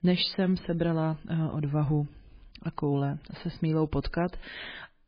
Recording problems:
garbled, watery; badly; nothing above 4.5 kHz

